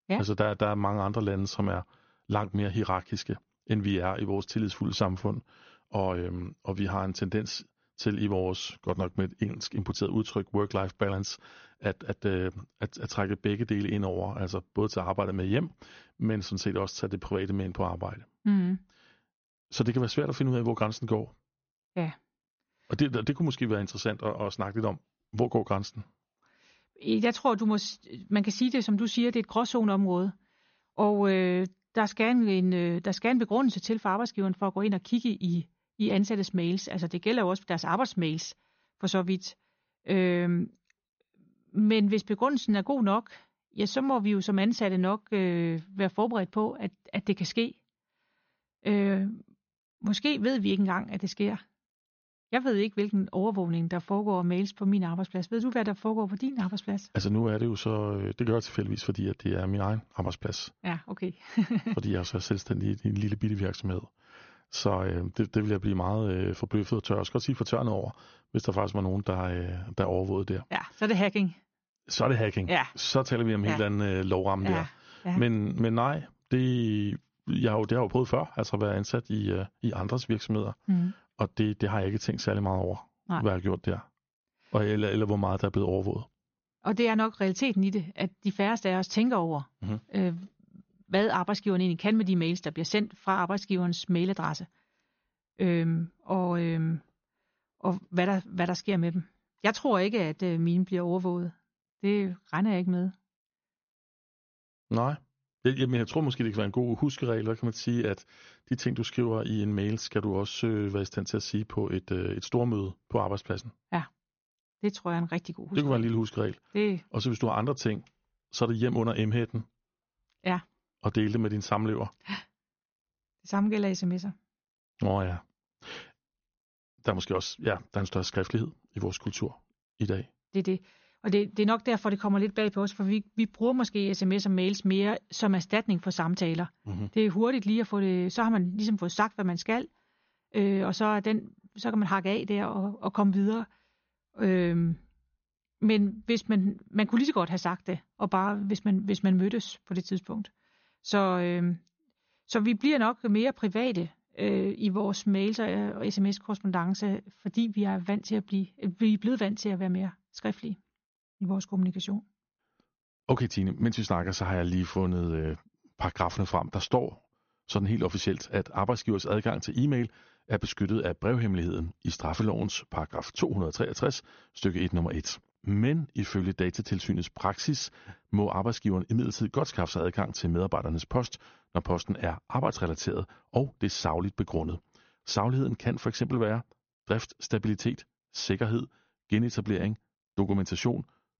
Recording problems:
high frequencies cut off; noticeable; nothing above 6.5 kHz

